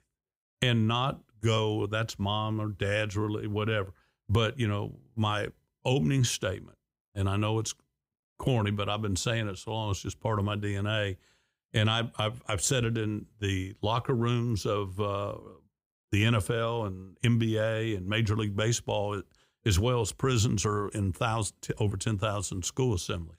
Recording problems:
none

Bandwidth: 15.5 kHz